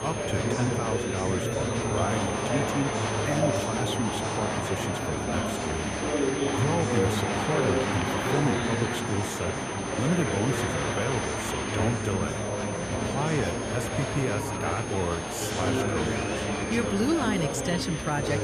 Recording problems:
murmuring crowd; very loud; throughout; 2 dB above the speech
high-pitched whine; loud; throughout; 6 kHz, 9 dB below the speech

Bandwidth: 14.5 kHz